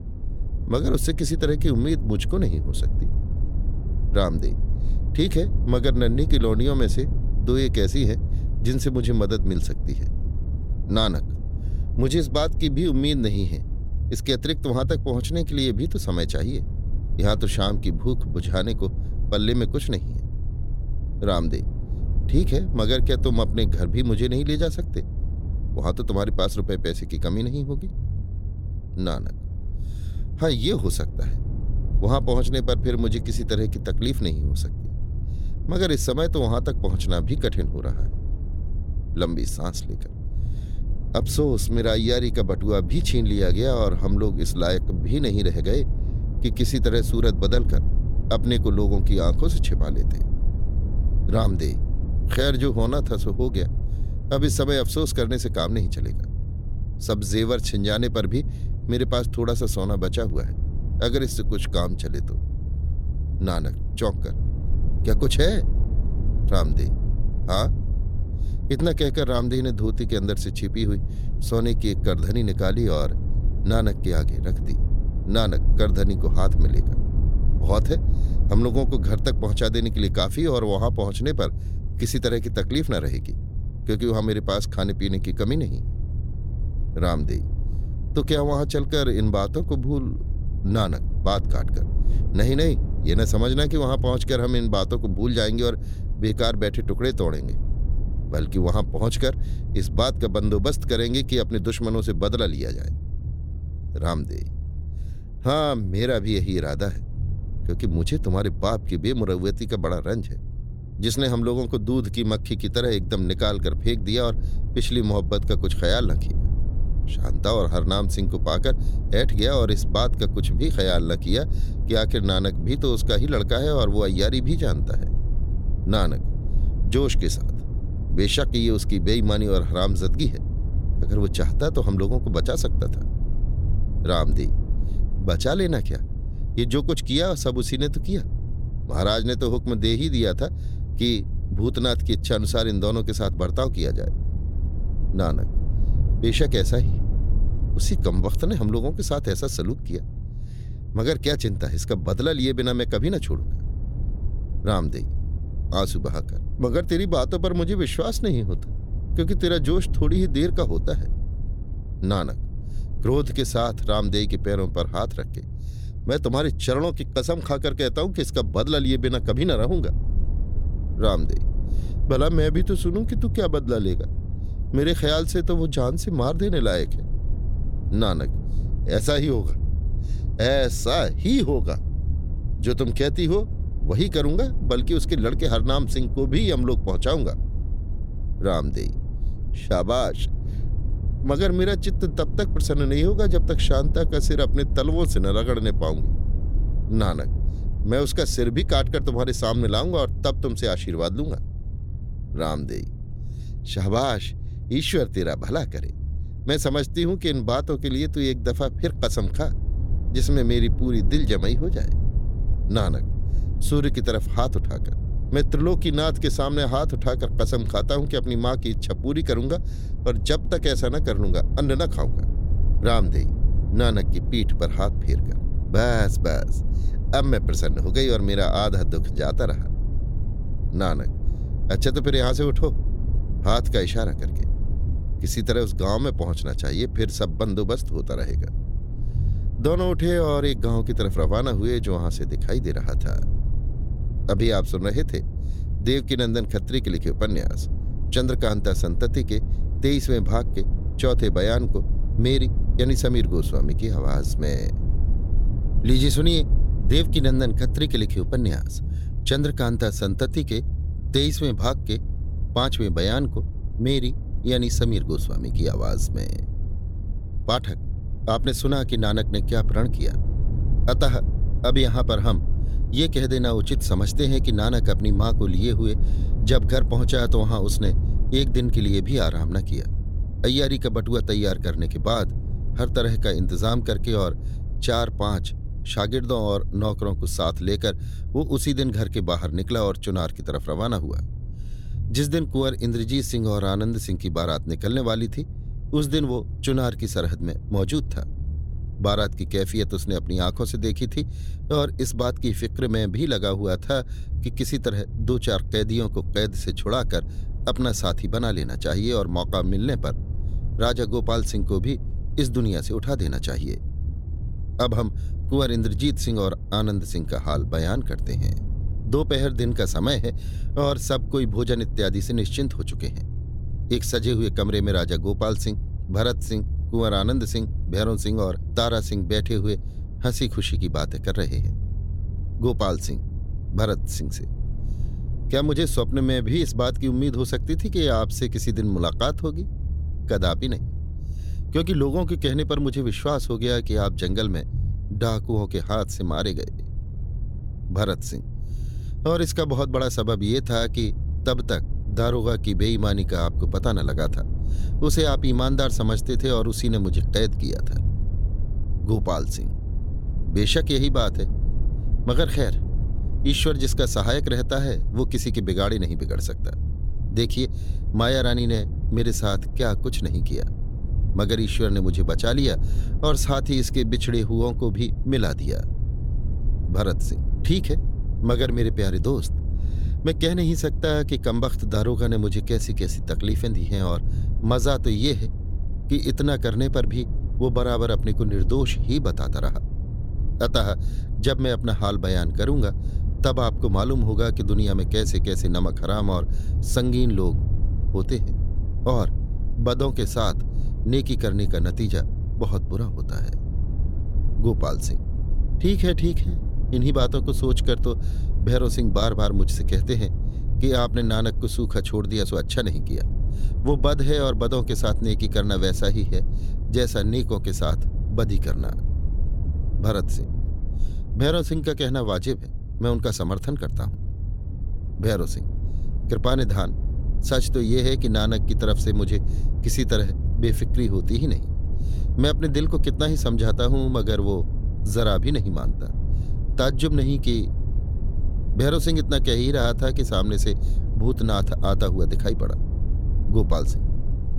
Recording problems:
low rumble; noticeable; throughout; 15 dB below the speech

